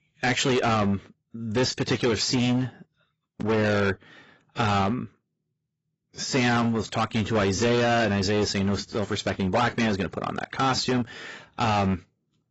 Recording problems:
distortion; heavy; 14% of the sound clipped
garbled, watery; badly; nothing above 7.5 kHz

